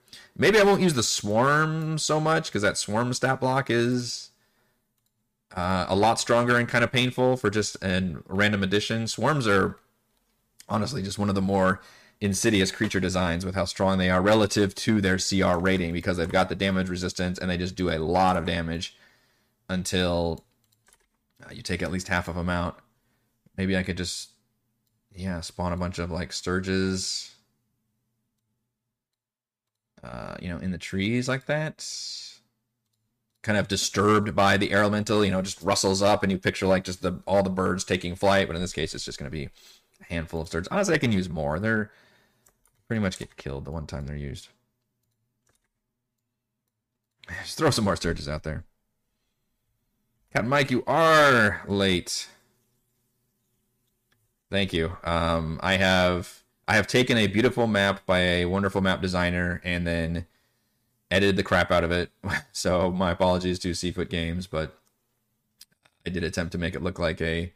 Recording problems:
distortion; slight; 2% of the sound clipped

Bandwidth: 15 kHz